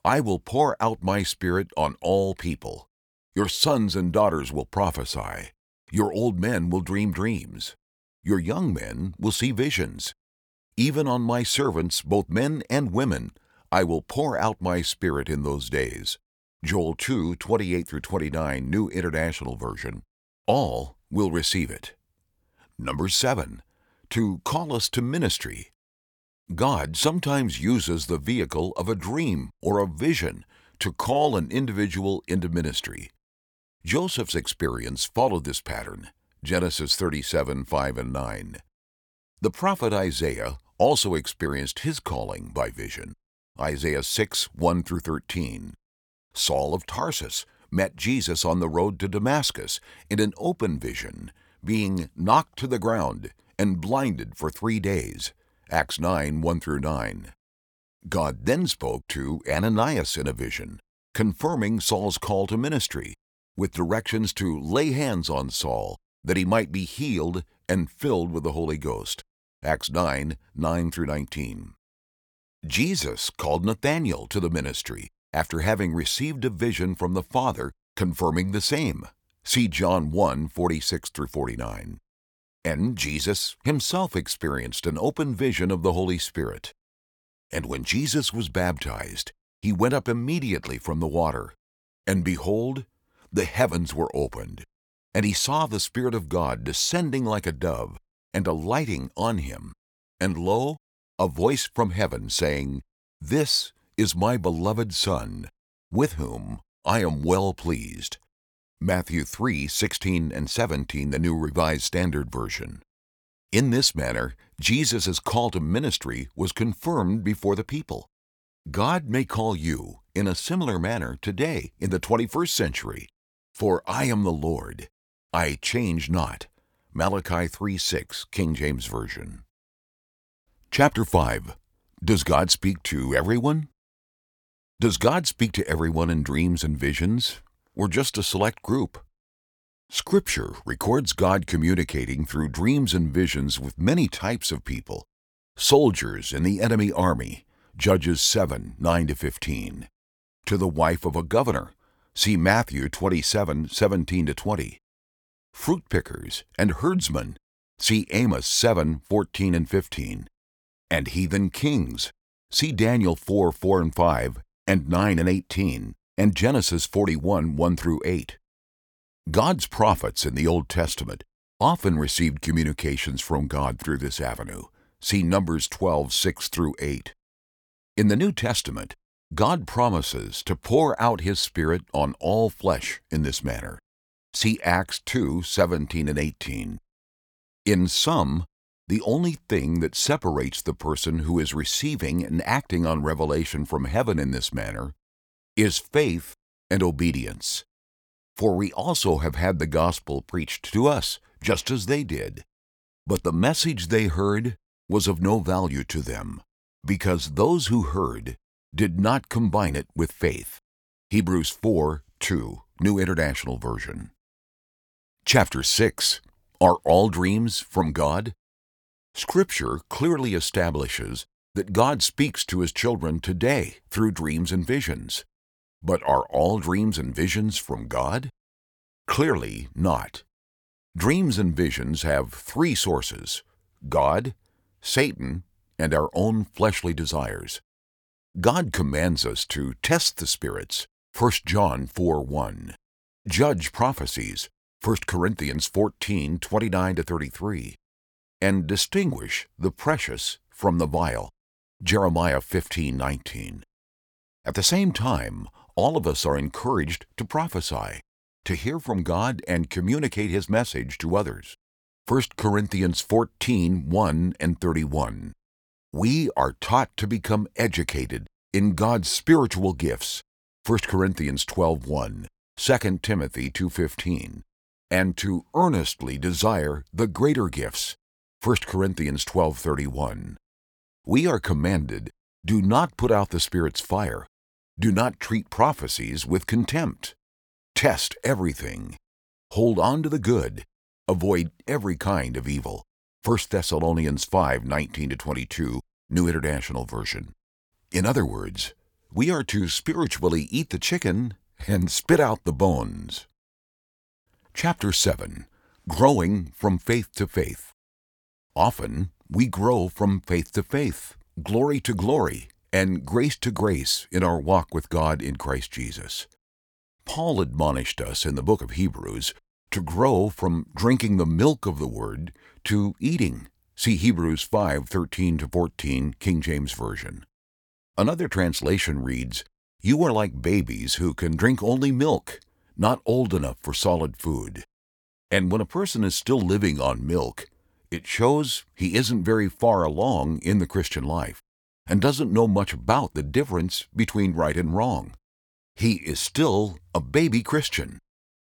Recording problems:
none

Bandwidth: 18.5 kHz